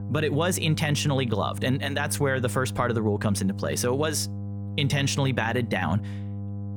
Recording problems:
electrical hum; noticeable; throughout; 50 Hz, 15 dB below the speech

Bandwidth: 18.5 kHz